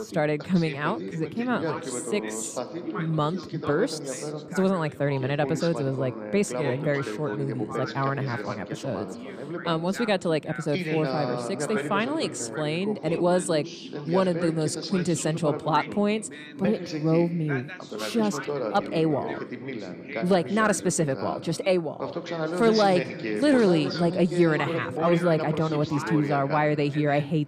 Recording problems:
background chatter; loud; throughout; 2 voices, 7 dB below the speech

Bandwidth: 15 kHz